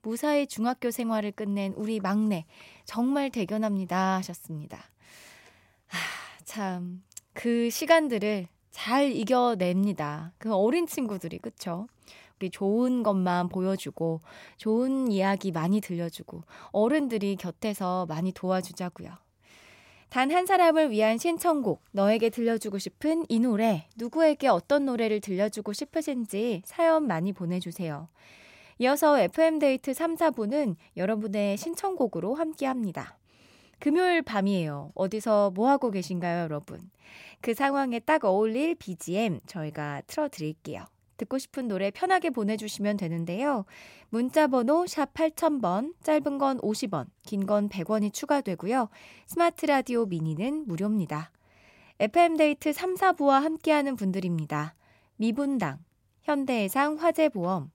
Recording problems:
none

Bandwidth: 16 kHz